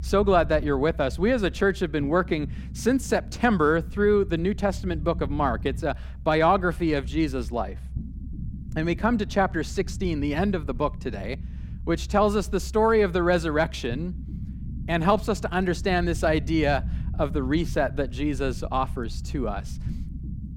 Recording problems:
low rumble; faint; throughout; 25 dB below the speech

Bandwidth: 16.5 kHz